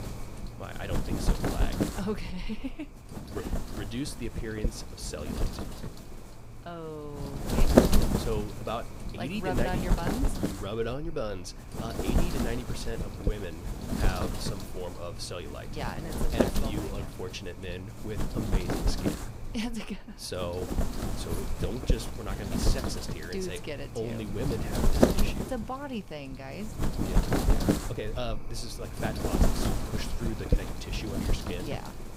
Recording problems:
wind noise on the microphone; heavy; 3 dB above the speech

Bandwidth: 15.5 kHz